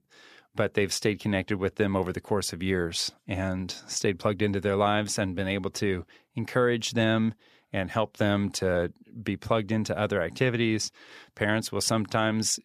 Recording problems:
none

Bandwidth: 14.5 kHz